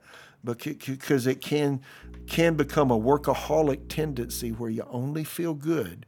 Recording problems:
electrical hum; faint; from 2 to 4.5 s; 60 Hz, 25 dB below the speech

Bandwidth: 18 kHz